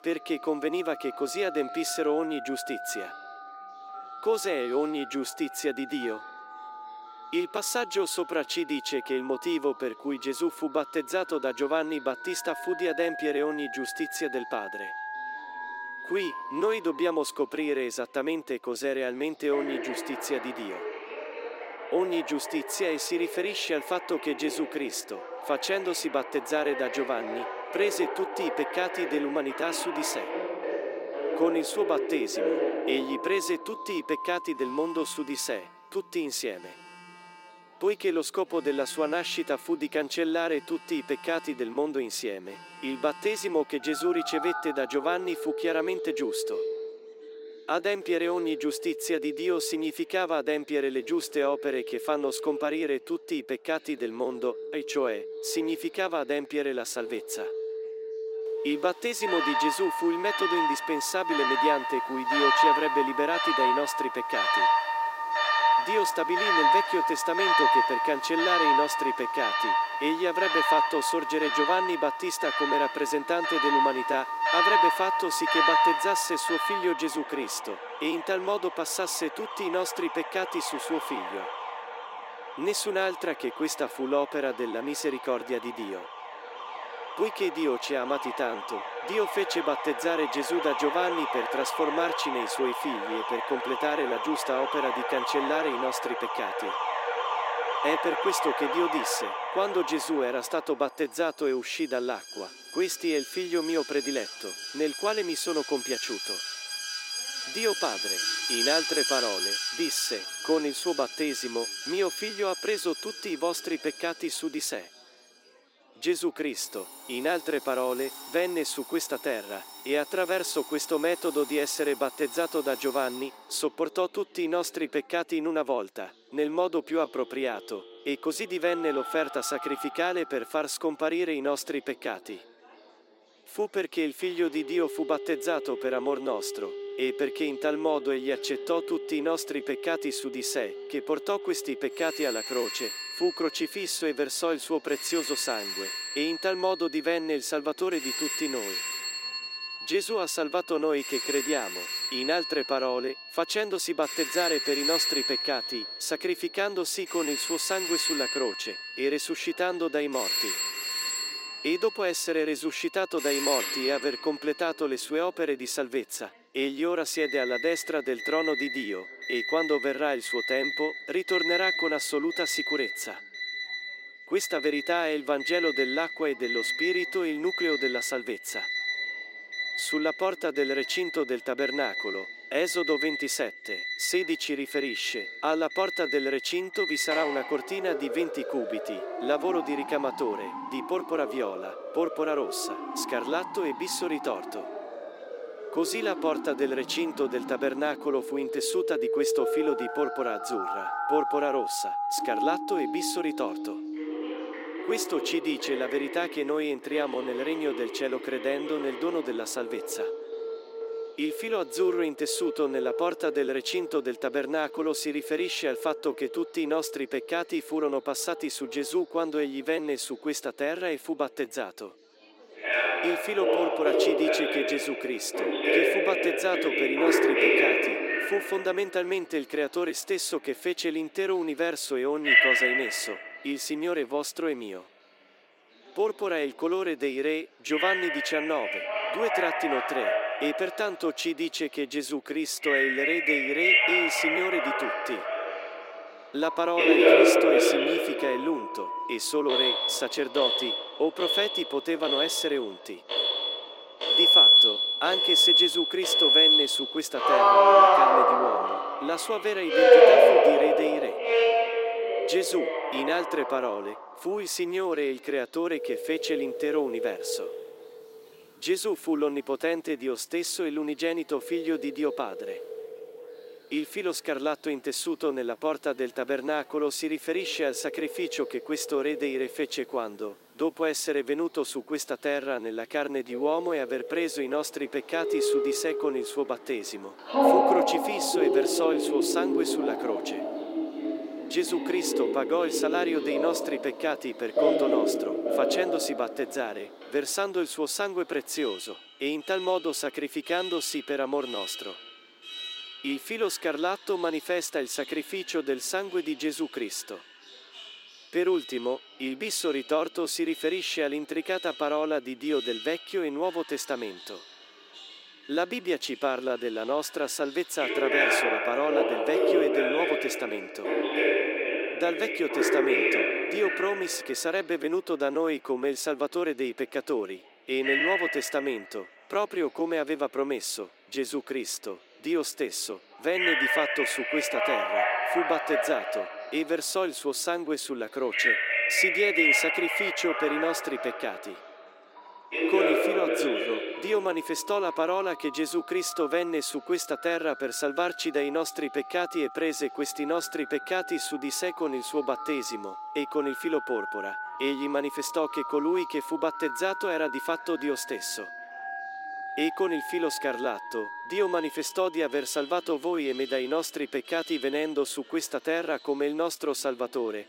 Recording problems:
thin; very slightly; fading below 300 Hz
alarms or sirens; very loud; throughout; 2 dB above the speech
chatter from many people; faint; throughout; 30 dB below the speech

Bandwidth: 16 kHz